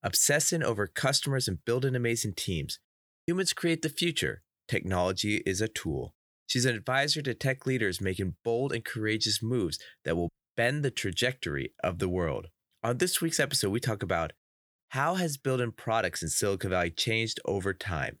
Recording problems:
none

